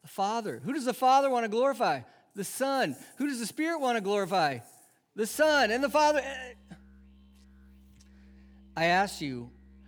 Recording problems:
background music; faint; throughout; 30 dB below the speech

